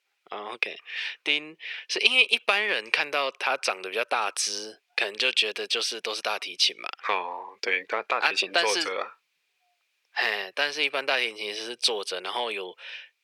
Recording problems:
thin; very; fading below 450 Hz

